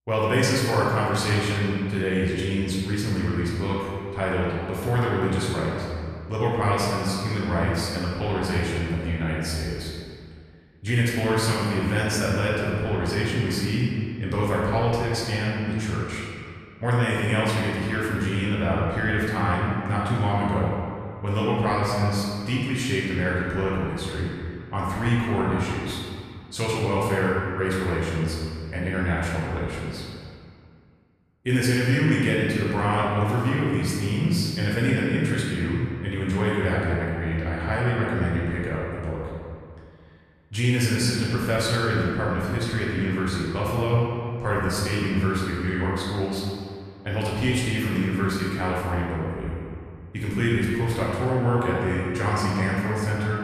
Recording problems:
room echo; strong; dies away in 2 s
off-mic speech; far

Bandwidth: 14 kHz